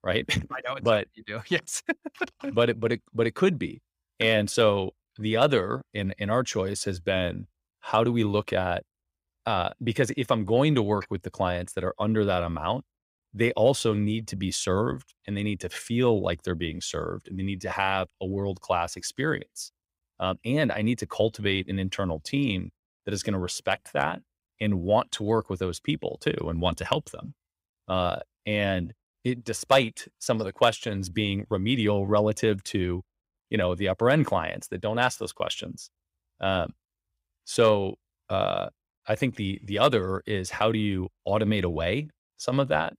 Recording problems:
none

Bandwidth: 15.5 kHz